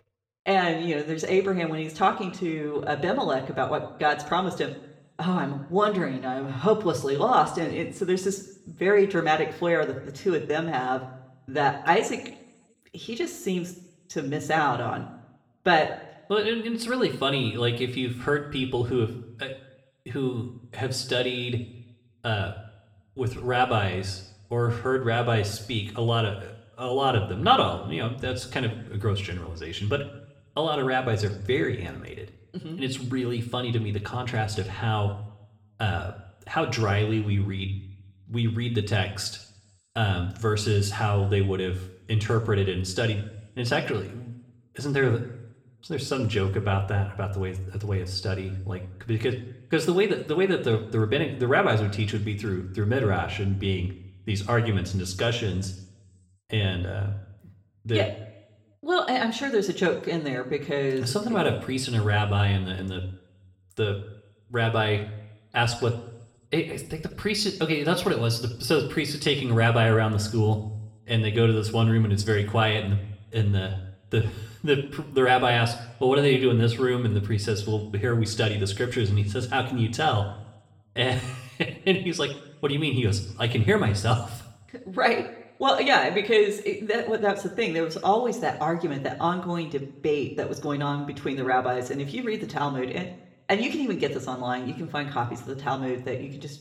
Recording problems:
room echo; slight; dies away in 0.6 s
off-mic speech; somewhat distant

